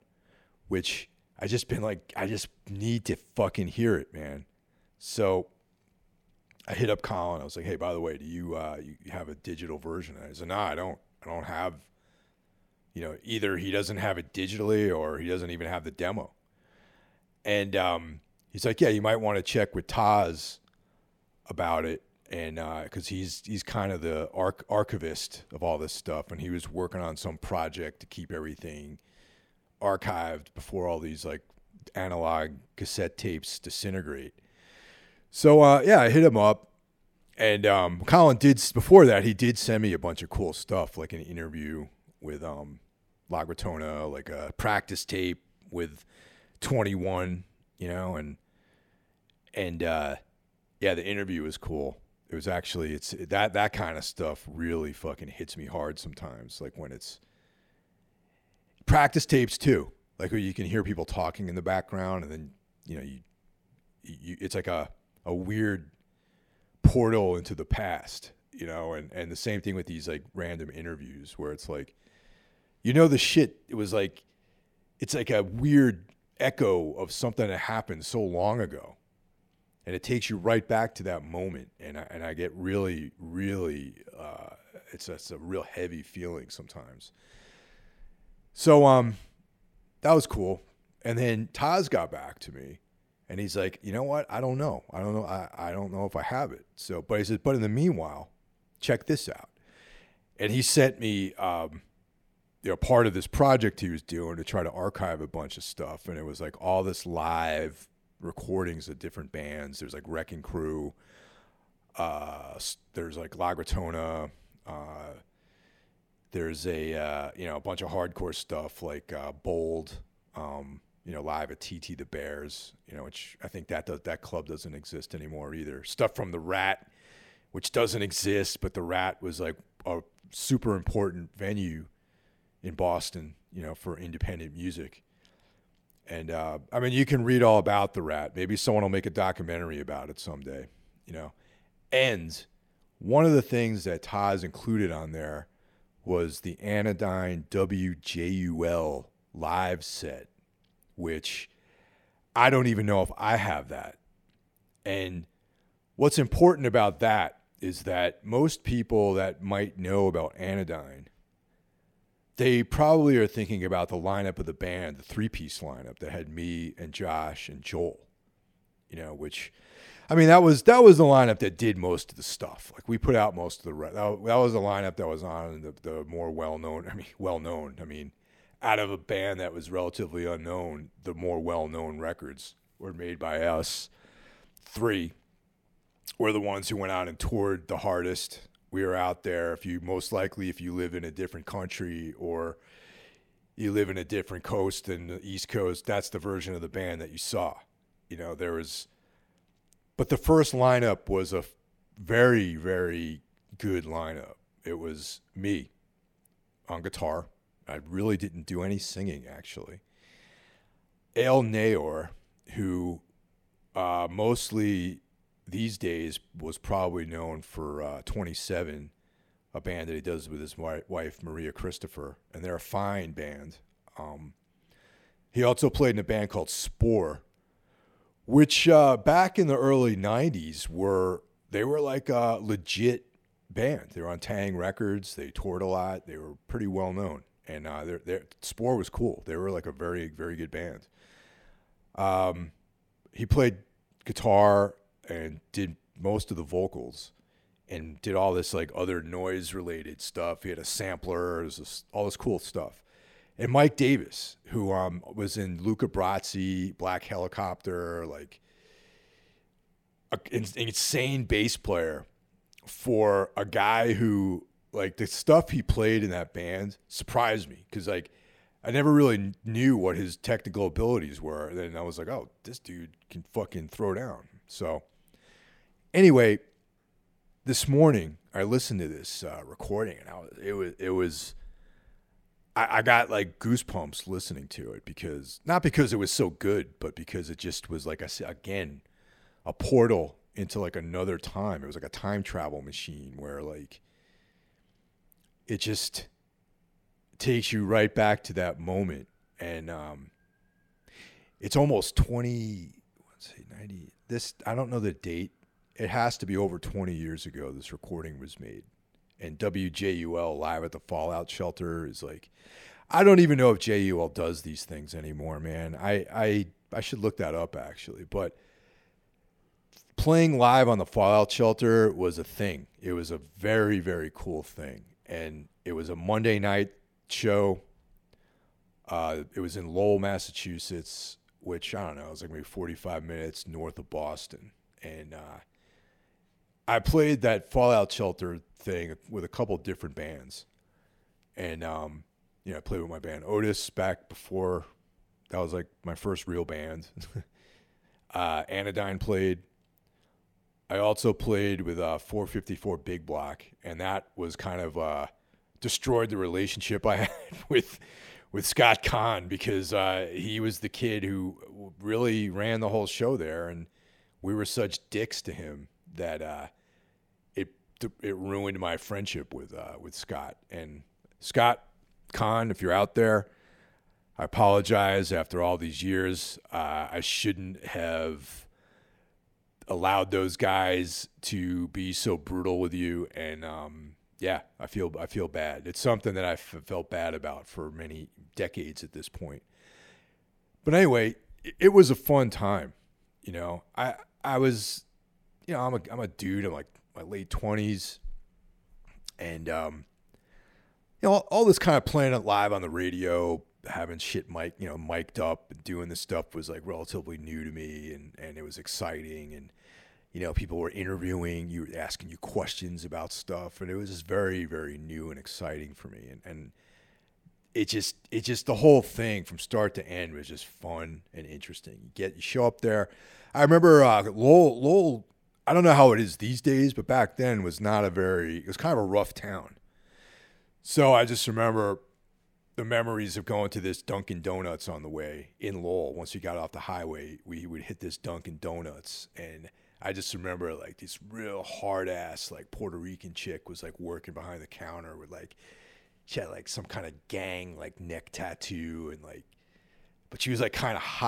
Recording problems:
abrupt cut into speech; at the end

